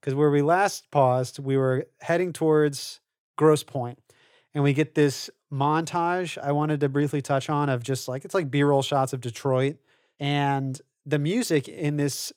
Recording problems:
none

